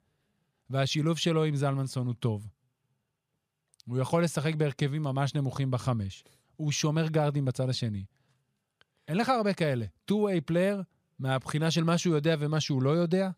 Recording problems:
none

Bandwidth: 15 kHz